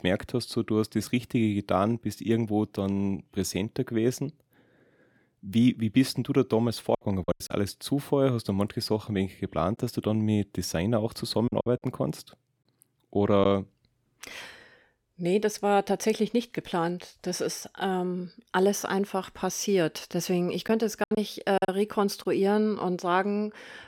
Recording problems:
choppy; very; at 7 s, from 11 to 13 s and from 21 to 22 s; 7% of the speech affected

